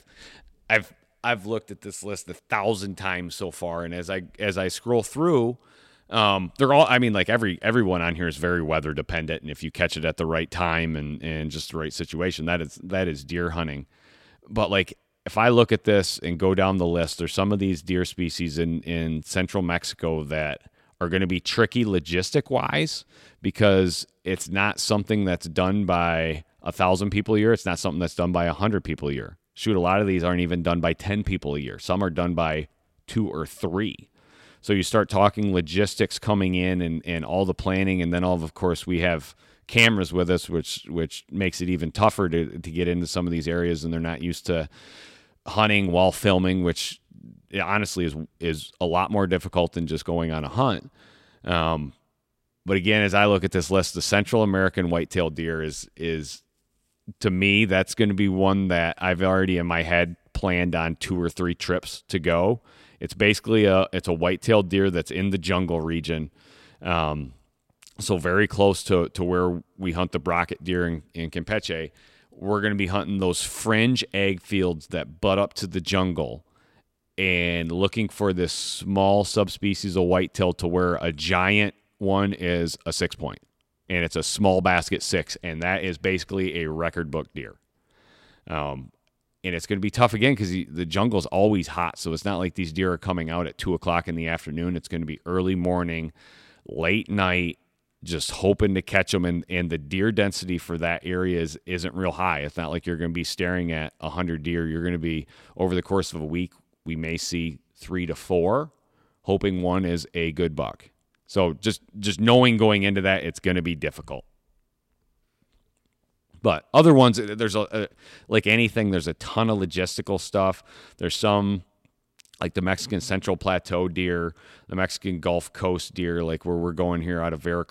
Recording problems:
none

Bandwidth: 16 kHz